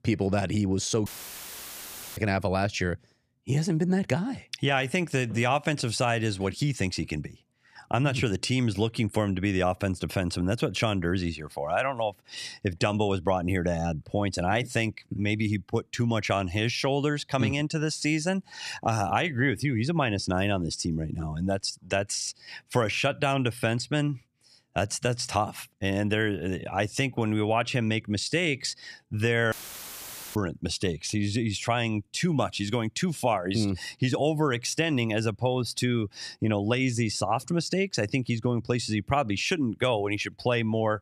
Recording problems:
audio cutting out; filled with static; at 1 s for 1 s and at 30 s for 1 s

